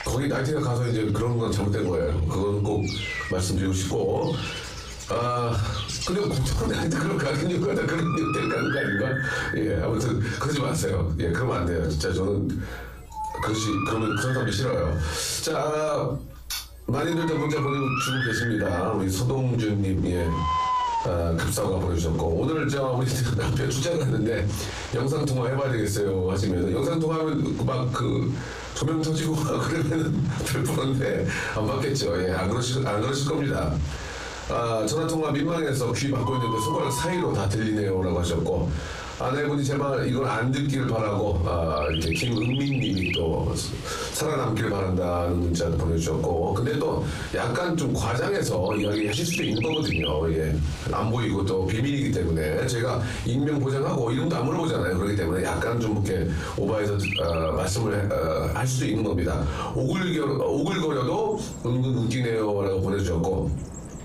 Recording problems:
off-mic speech; far
room echo; slight; dies away in 0.3 s
squashed, flat; somewhat
animal sounds; very faint; throughout; 8 dB below the speech

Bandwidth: 14.5 kHz